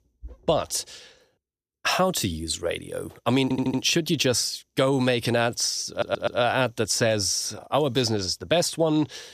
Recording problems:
audio stuttering; at 3.5 s and at 6 s

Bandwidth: 15 kHz